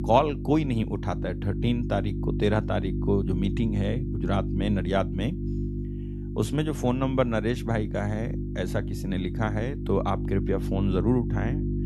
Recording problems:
electrical hum; loud; throughout; 50 Hz, 9 dB below the speech

